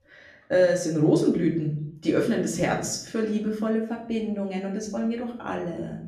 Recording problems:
off-mic speech; far
room echo; slight; dies away in 0.6 s

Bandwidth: 14.5 kHz